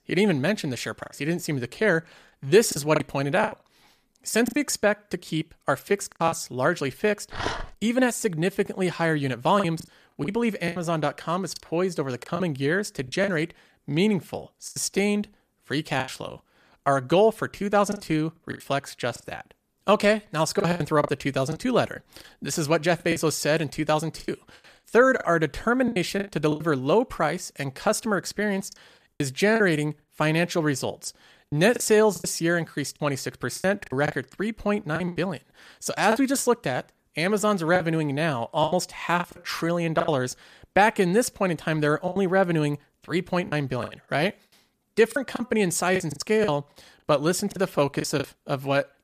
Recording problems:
choppy; very; 9% of the speech affected
dog barking; noticeable; at 7.5 s; peak 6 dB below the speech

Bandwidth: 14.5 kHz